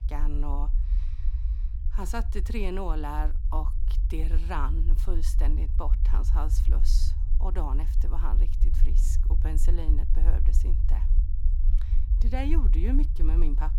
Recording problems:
low rumble; noticeable; throughout; 10 dB below the speech

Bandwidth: 18.5 kHz